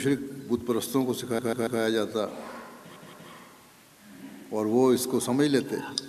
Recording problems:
audio stuttering; at 1.5 s and at 3 s

